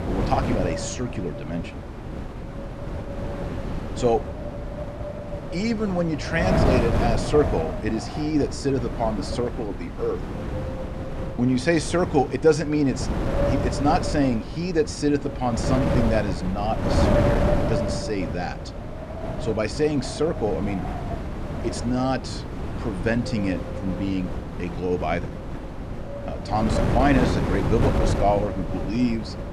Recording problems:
wind noise on the microphone; heavy; 4 dB below the speech

